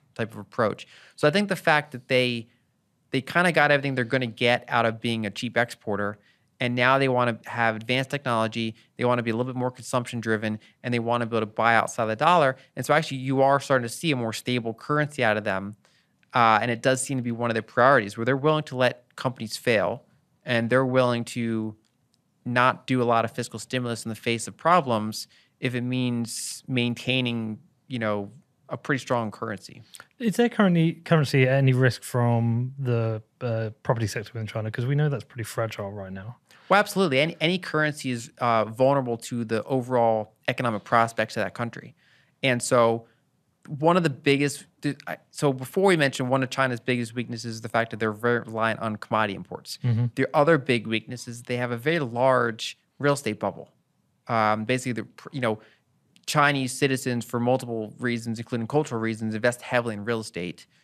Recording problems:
none

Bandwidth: 14 kHz